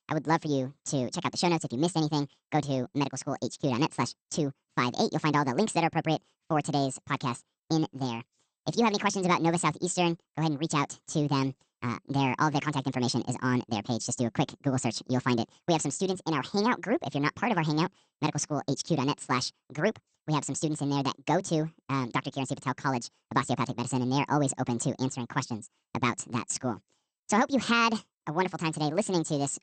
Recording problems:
wrong speed and pitch; too fast and too high; 1.6 times normal speed
garbled, watery; slightly; nothing above 8.5 kHz

